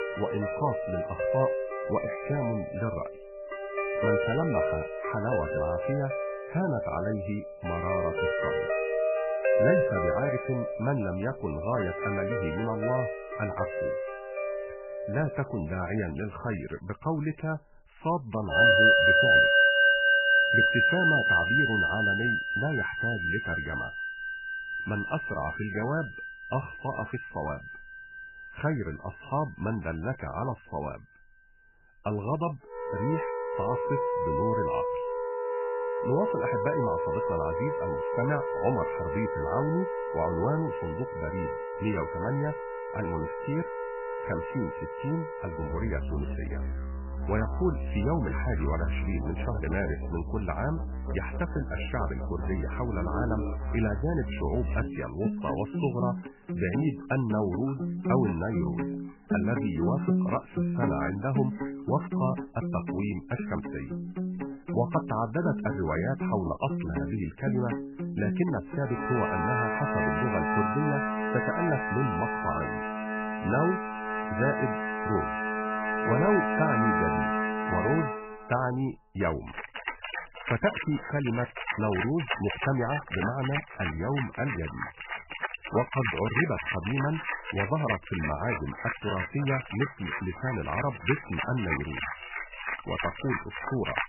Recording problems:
garbled, watery; badly; nothing above 3 kHz
background music; very loud; throughout; 2 dB above the speech

